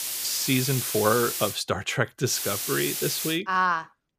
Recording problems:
hiss; loud; until 1.5 s and from 2.5 to 3.5 s; 3 dB below the speech

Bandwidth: 15 kHz